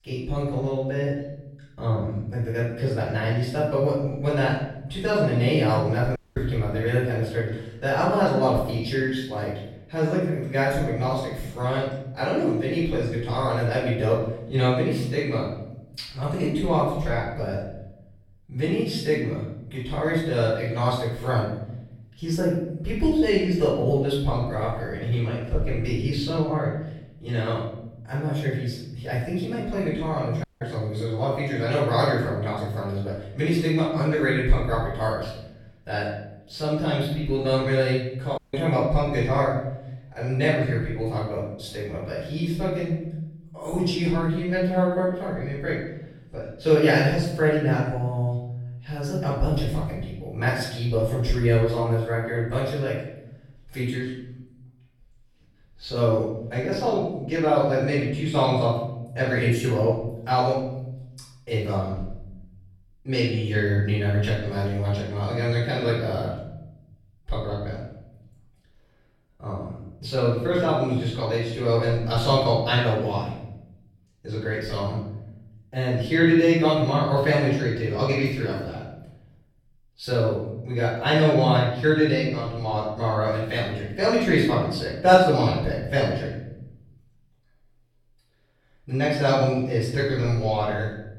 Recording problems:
off-mic speech; far
room echo; noticeable; dies away in 0.9 s
audio cutting out; at 6 s, at 30 s and at 38 s

